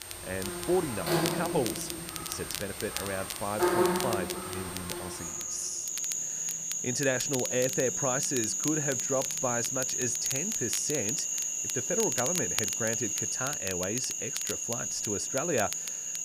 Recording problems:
animal sounds; very loud; throughout; 3 dB above the speech
crackle, like an old record; loud; 6 dB below the speech

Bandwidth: 15 kHz